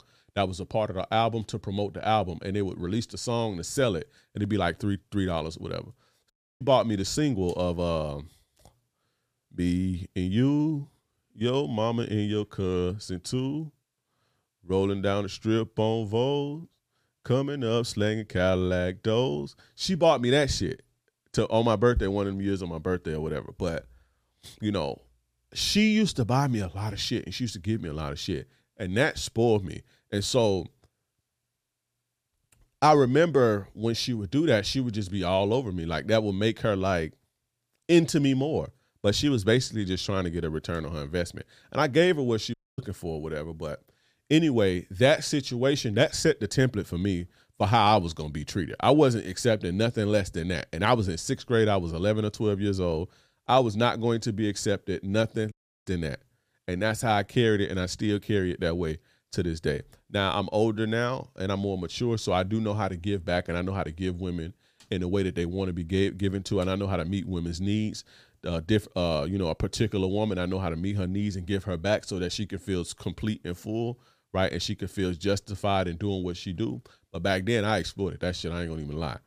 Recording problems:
audio cutting out; at 6.5 s, at 43 s and at 56 s

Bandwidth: 15 kHz